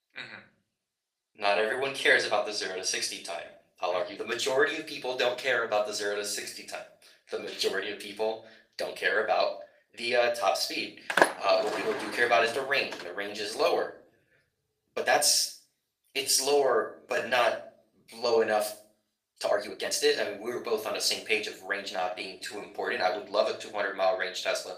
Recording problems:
thin; very; fading below 750 Hz
room echo; slight; dies away in 0.4 s
off-mic speech; somewhat distant
garbled, watery; slightly; nothing above 15 kHz
uneven, jittery; strongly; from 1 to 23 s
door banging; loud; at 11 s; peak 4 dB above the speech

